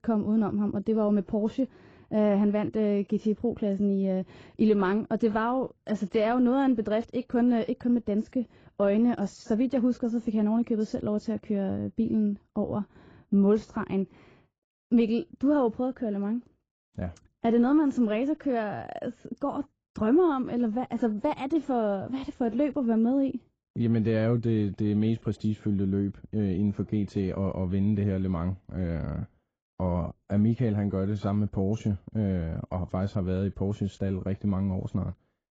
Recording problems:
garbled, watery; badly; nothing above 7.5 kHz
muffled; very slightly; fading above 1 kHz

